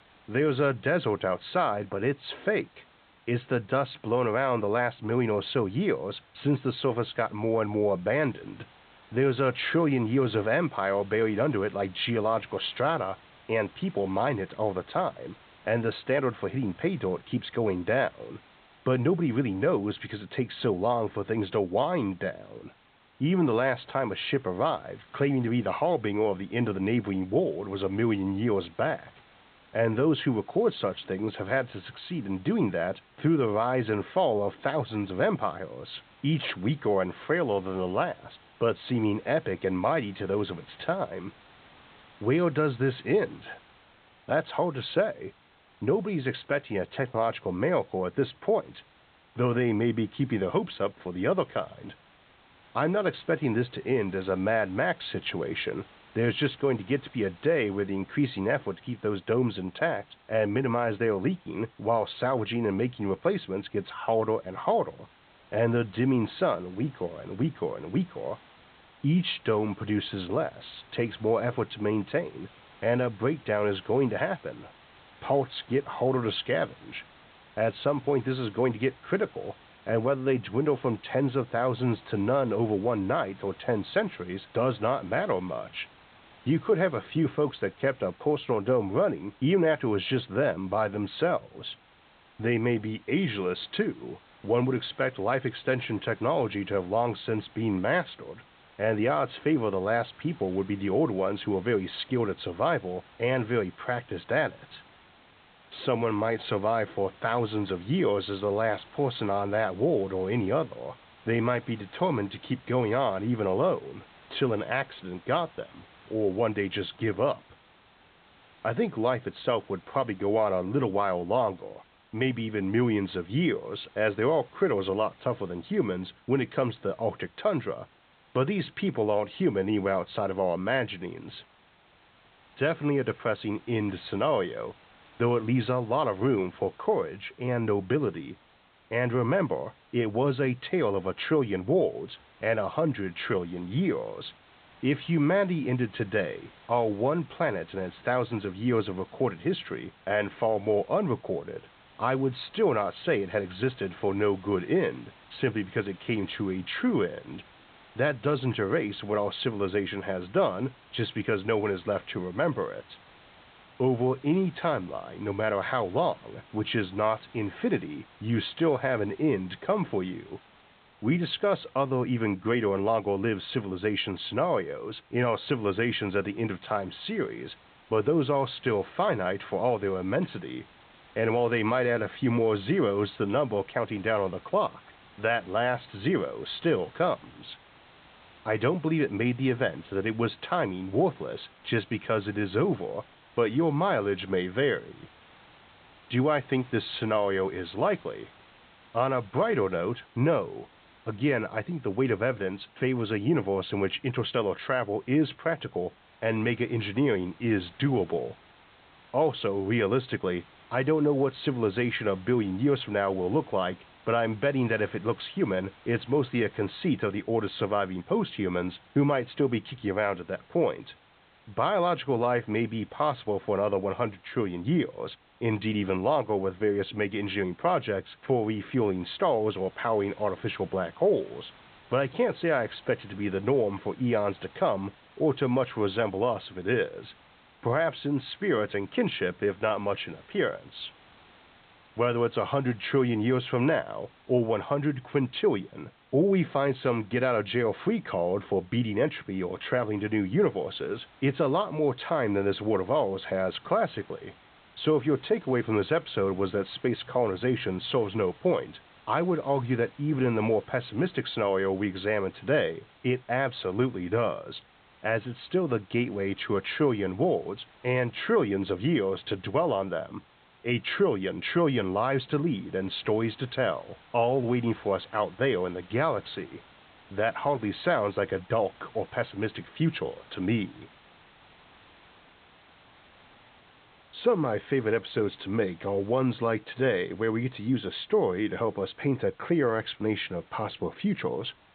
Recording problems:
high frequencies cut off; severe; nothing above 4 kHz
hiss; faint; throughout; 25 dB below the speech

